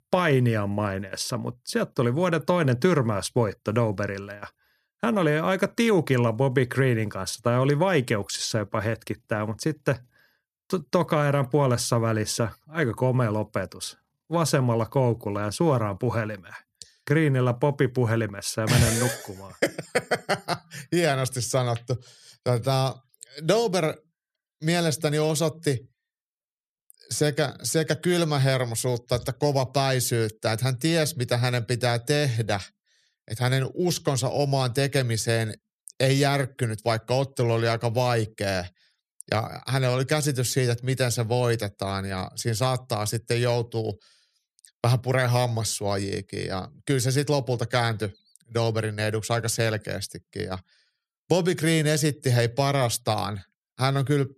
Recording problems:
none

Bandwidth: 14 kHz